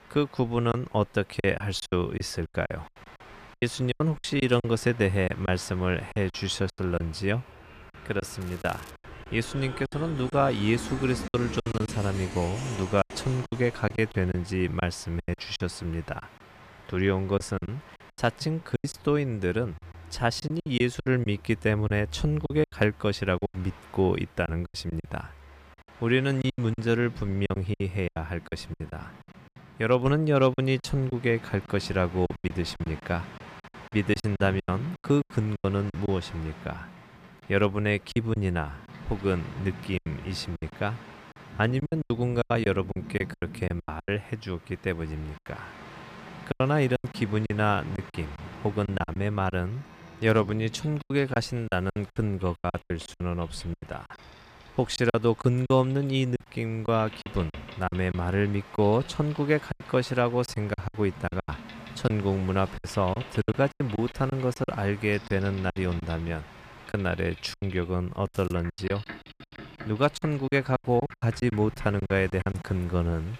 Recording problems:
train or aircraft noise; noticeable; throughout; 15 dB below the speech
crackling; faint; at 8.5 s and at 1:08; 25 dB below the speech
choppy; very; 12% of the speech affected

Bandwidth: 14.5 kHz